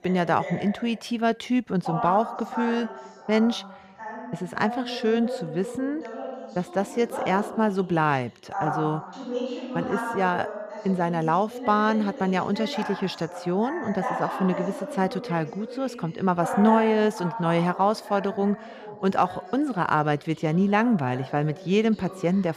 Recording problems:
voice in the background; loud; throughout; 9 dB below the speech

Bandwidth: 15 kHz